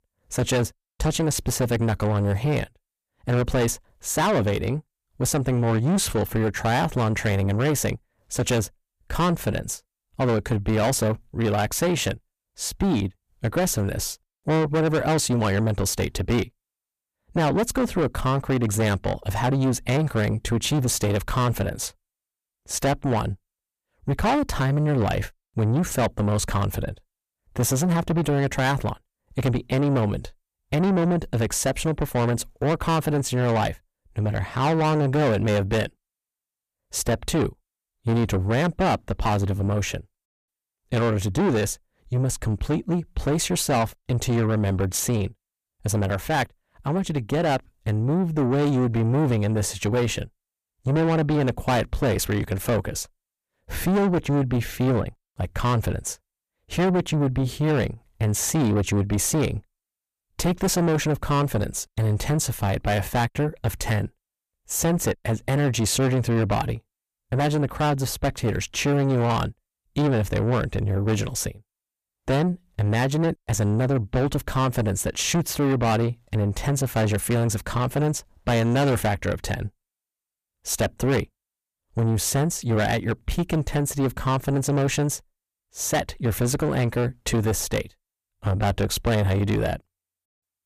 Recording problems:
distortion; heavy; 7 dB below the speech

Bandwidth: 14.5 kHz